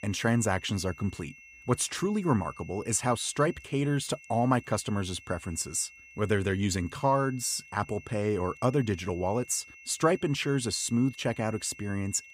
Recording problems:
high-pitched whine; noticeable; throughout; 2.5 kHz, 20 dB below the speech

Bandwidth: 15 kHz